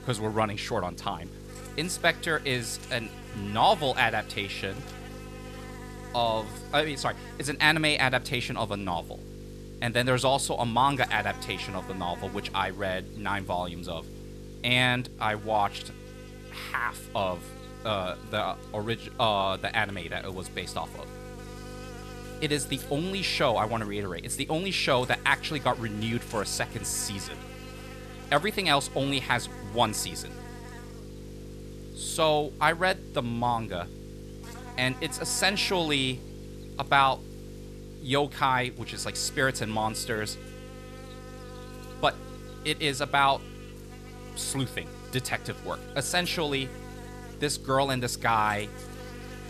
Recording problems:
electrical hum; noticeable; throughout; 50 Hz, 20 dB below the speech

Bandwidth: 14 kHz